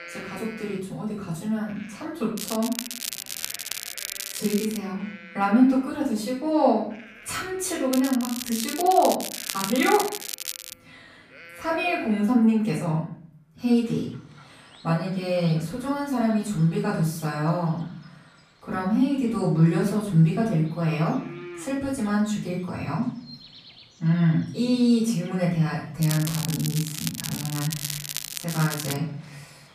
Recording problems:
off-mic speech; far
room echo; noticeable; dies away in 0.5 s
crackling; loud; from 2.5 to 5 s, from 8 to 11 s and from 26 to 29 s; 7 dB below the speech
animal sounds; faint; throughout; 25 dB below the speech

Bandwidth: 14.5 kHz